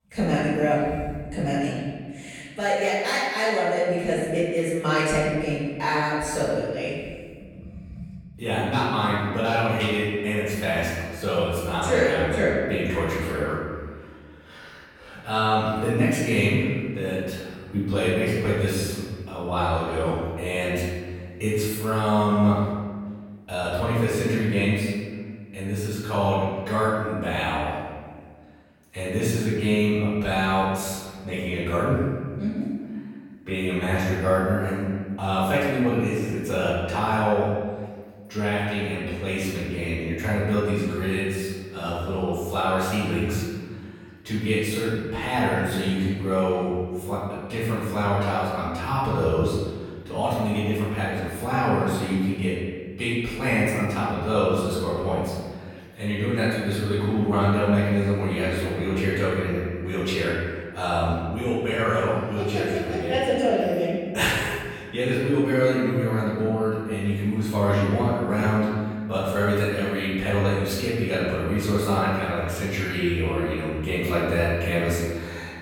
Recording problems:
room echo; strong; dies away in 1.6 s
off-mic speech; far

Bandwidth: 17.5 kHz